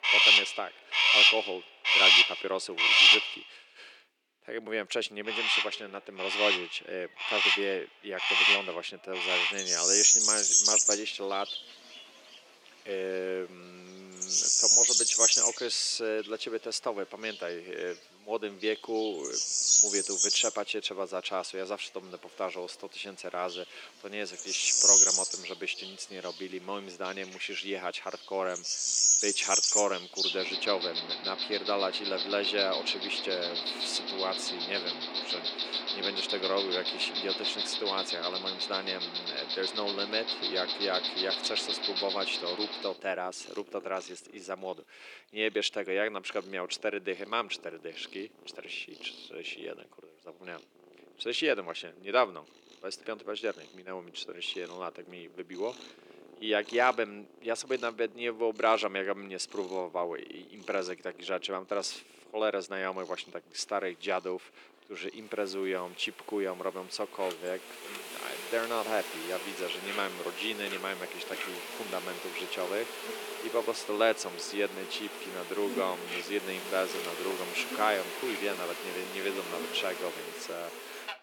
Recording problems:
thin; very; fading below 300 Hz
animal sounds; very loud; throughout; 8 dB above the speech

